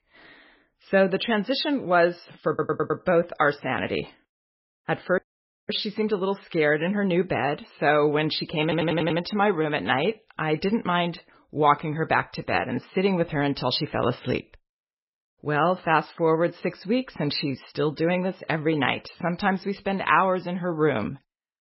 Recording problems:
garbled, watery; badly; nothing above 5.5 kHz
audio stuttering; at 2.5 s and at 8.5 s
audio cutting out; at 5 s for 0.5 s

